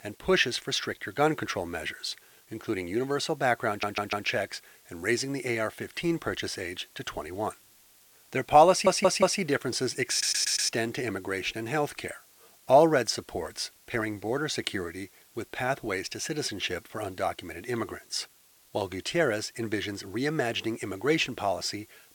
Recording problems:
thin; somewhat; fading below 600 Hz
hiss; faint; throughout; 25 dB below the speech
audio stuttering; at 3.5 s, at 8.5 s and at 10 s

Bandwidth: 18 kHz